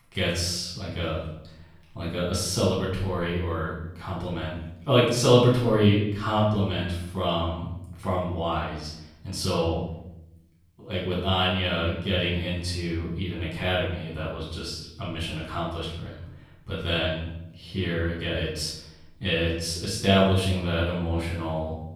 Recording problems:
off-mic speech; far
room echo; noticeable; dies away in 0.8 s

